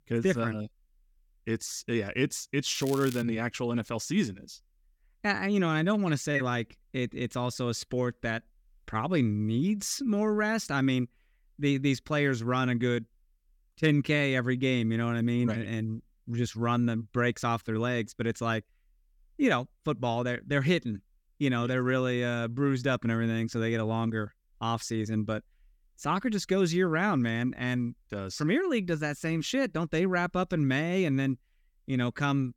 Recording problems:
crackling; noticeable; at 3 s; 15 dB below the speech

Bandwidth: 17.5 kHz